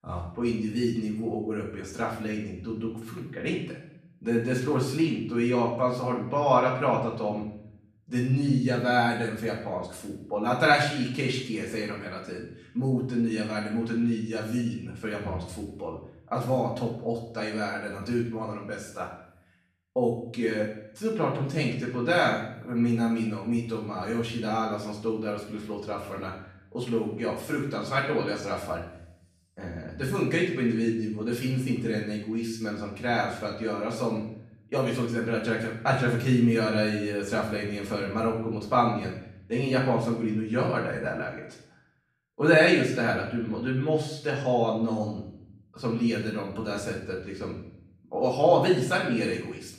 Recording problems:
off-mic speech; far
room echo; noticeable; dies away in 0.7 s

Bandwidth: 14 kHz